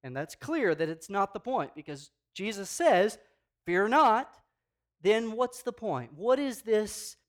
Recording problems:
none

